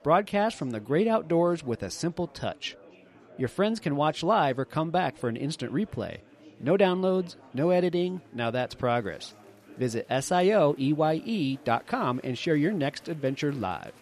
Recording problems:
chatter from many people; faint; throughout; 25 dB below the speech

